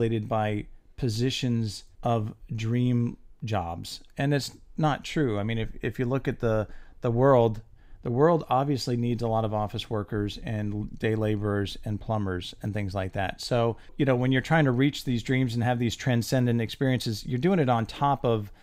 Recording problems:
abrupt cut into speech; at the start

